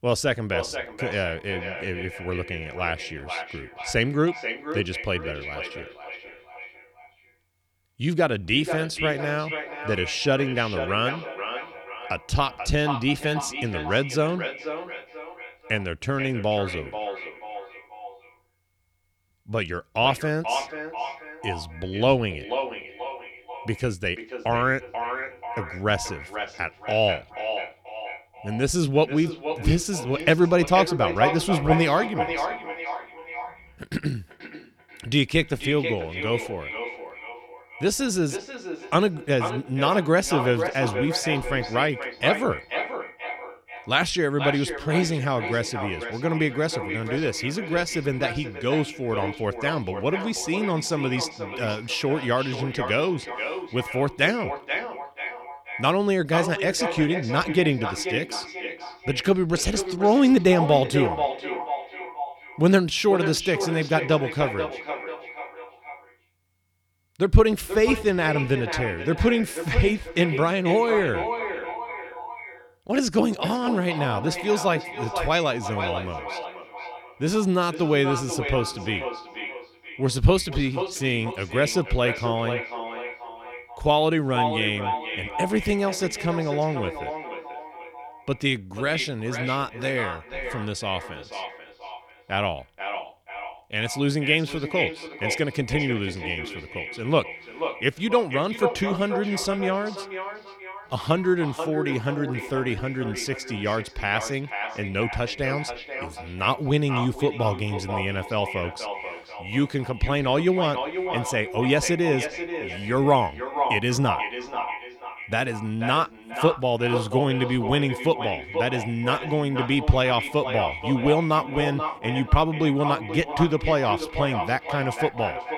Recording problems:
echo of what is said; strong; throughout; 480 ms later, 8 dB below the speech

